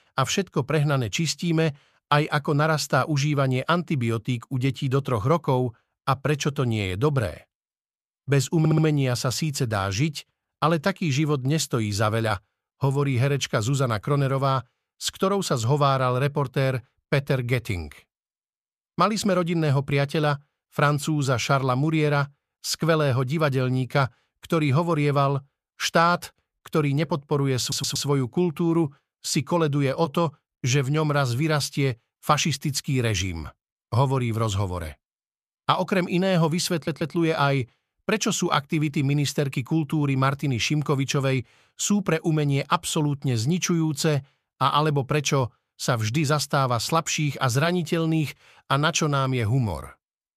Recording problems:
audio stuttering; at 8.5 s, at 28 s and at 37 s

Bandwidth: 14.5 kHz